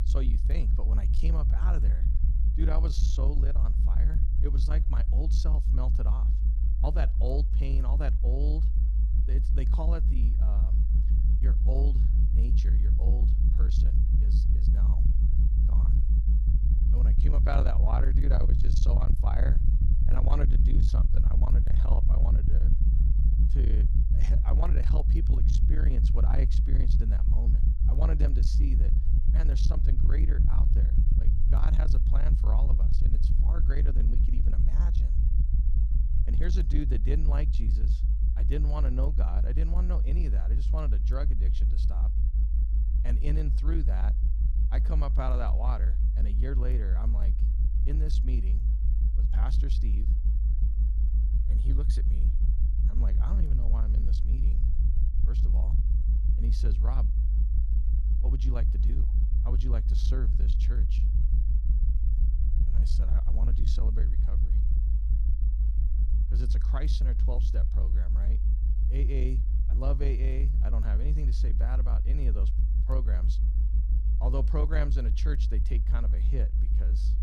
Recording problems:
distortion; slight; 10 dB below the speech
low rumble; loud; throughout; 5 dB below the speech

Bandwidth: 15.5 kHz